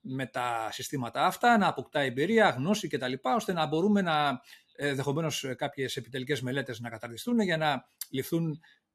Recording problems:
none

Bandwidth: 13.5 kHz